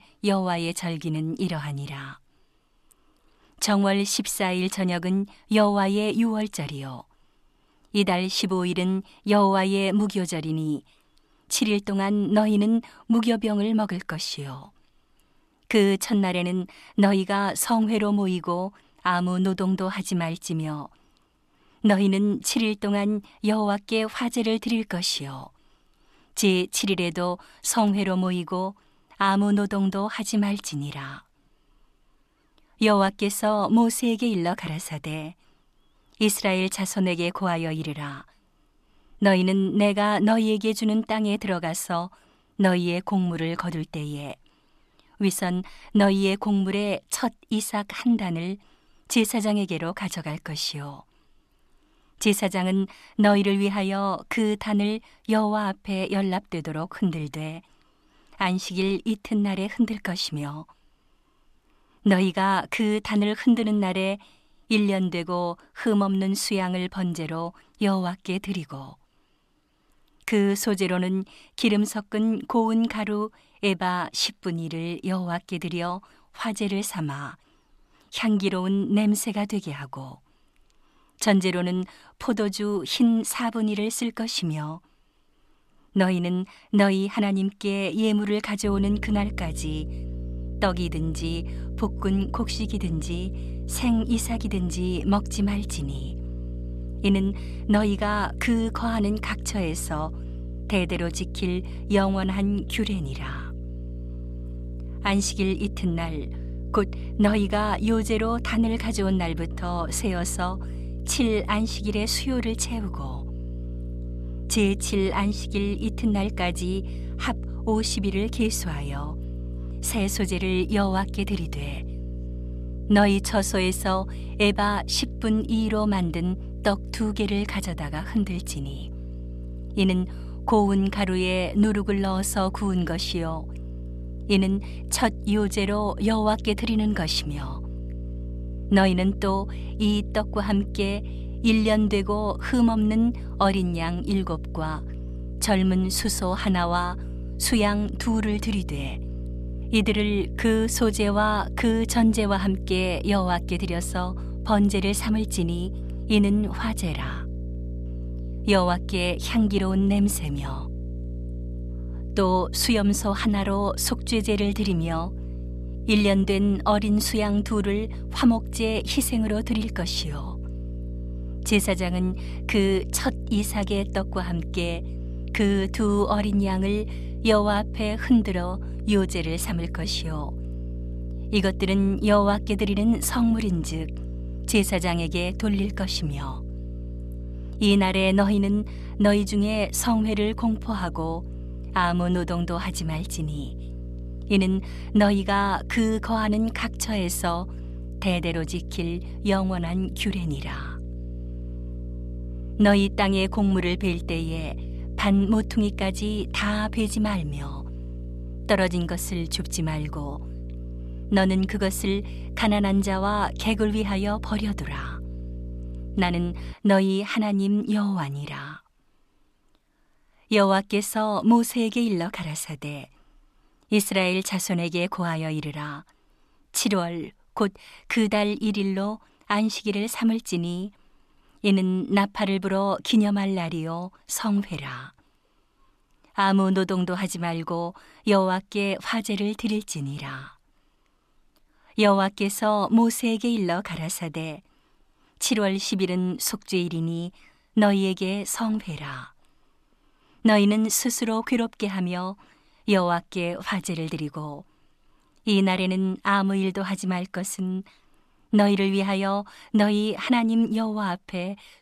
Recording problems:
electrical hum; noticeable; from 1:29 to 3:37; 60 Hz, 20 dB below the speech

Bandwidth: 14 kHz